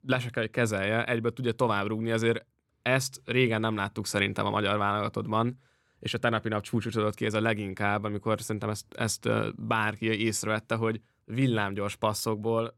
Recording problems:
none

